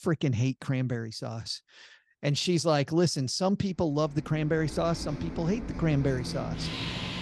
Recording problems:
traffic noise; loud; from 4.5 s on; 8 dB below the speech

